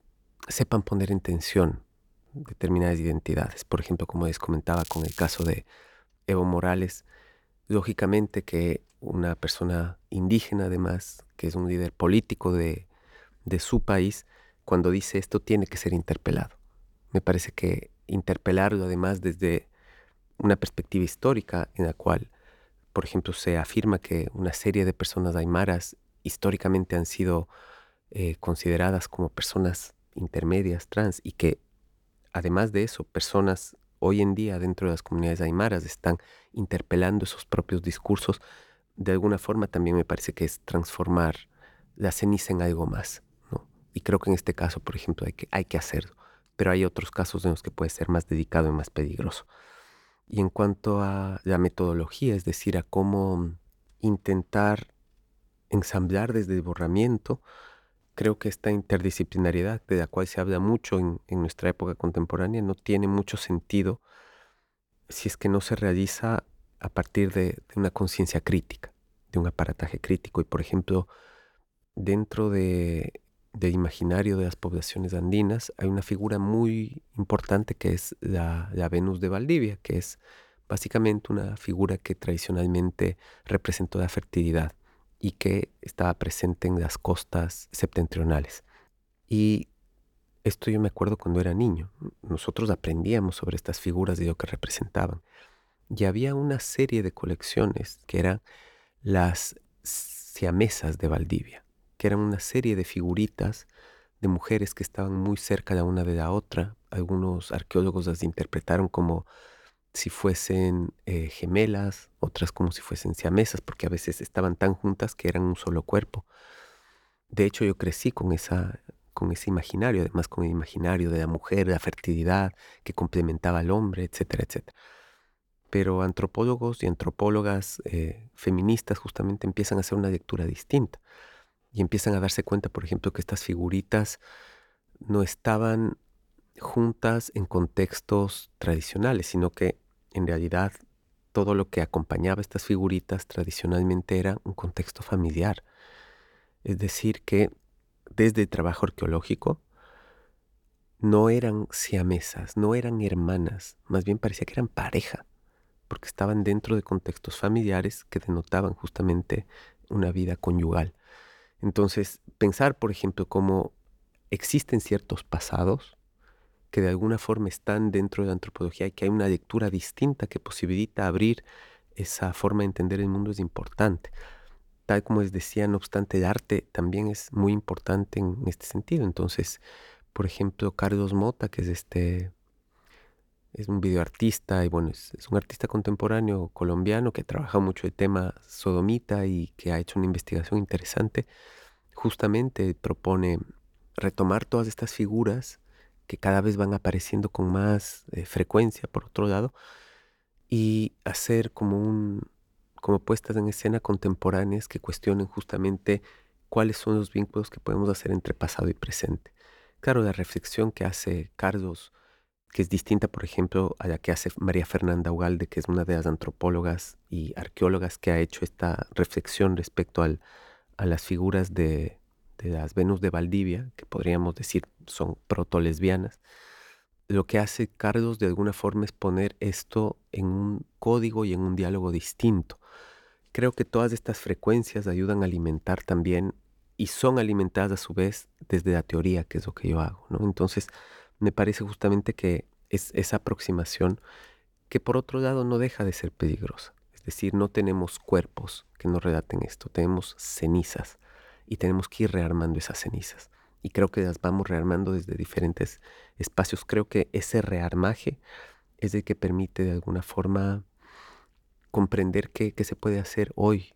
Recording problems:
crackling; noticeable; at 4.5 s; 15 dB below the speech

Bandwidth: 18.5 kHz